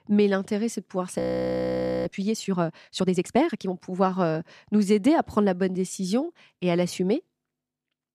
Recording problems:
audio freezing; at 1 s for 1 s

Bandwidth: 14 kHz